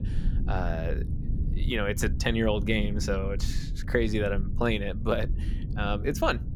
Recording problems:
low rumble; noticeable; throughout; 15 dB below the speech

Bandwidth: 18.5 kHz